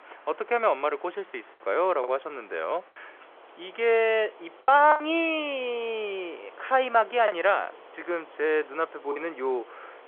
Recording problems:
phone-call audio; nothing above 3 kHz
traffic noise; faint; throughout; 25 dB below the speech
choppy; occasionally; 4% of the speech affected

